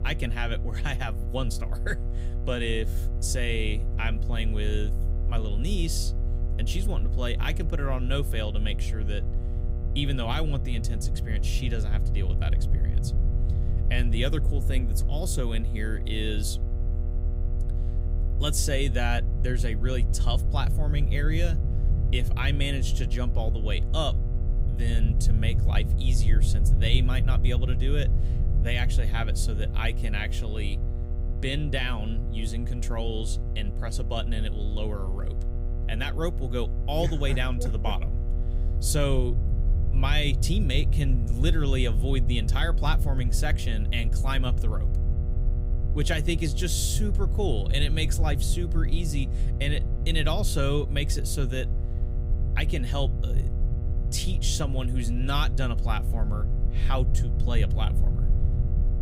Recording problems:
electrical hum; noticeable; throughout; 60 Hz, 15 dB below the speech
low rumble; noticeable; throughout; 15 dB below the speech

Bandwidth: 15.5 kHz